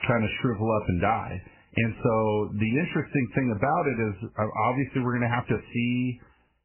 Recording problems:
garbled, watery; badly; nothing above 3 kHz

